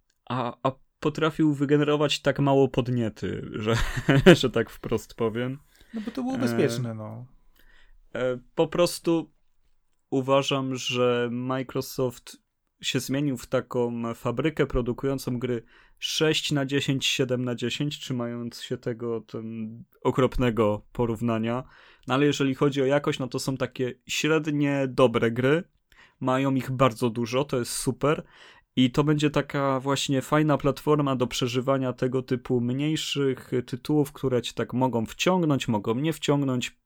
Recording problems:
none

